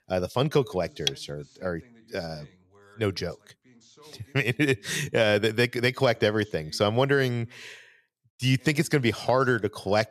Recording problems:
voice in the background; faint; throughout; 30 dB below the speech

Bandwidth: 14 kHz